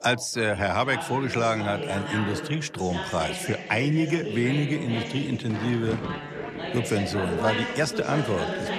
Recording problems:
background chatter; loud; throughout; 3 voices, 5 dB below the speech
rain or running water; noticeable; from 5 s on; 15 dB below the speech

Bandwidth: 14 kHz